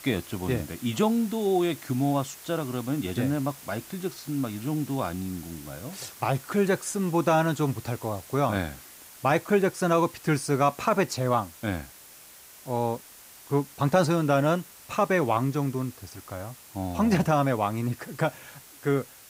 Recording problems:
hiss; noticeable; throughout; 20 dB below the speech

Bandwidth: 15.5 kHz